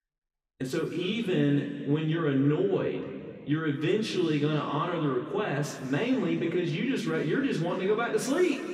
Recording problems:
room echo; noticeable; dies away in 2.2 s
off-mic speech; somewhat distant

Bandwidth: 15.5 kHz